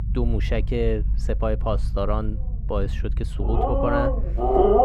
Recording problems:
muffled; slightly; fading above 3 kHz
animal sounds; very loud; throughout; 5 dB above the speech
low rumble; noticeable; throughout; 15 dB below the speech

